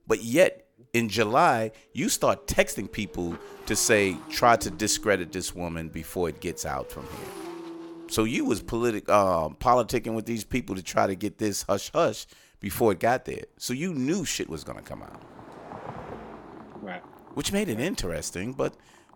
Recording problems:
traffic noise; noticeable; throughout; 20 dB below the speech

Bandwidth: 18 kHz